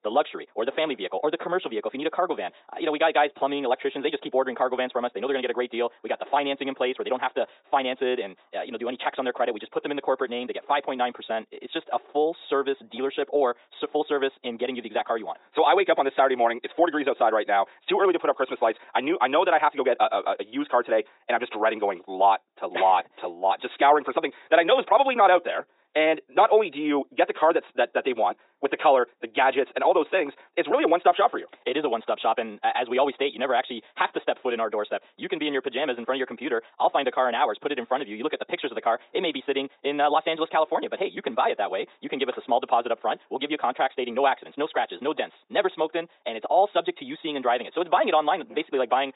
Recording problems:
thin; very; fading below 350 Hz
high frequencies cut off; severe; nothing above 4 kHz
wrong speed, natural pitch; too fast; 1.6 times normal speed
muffled; very slightly; fading above 2 kHz

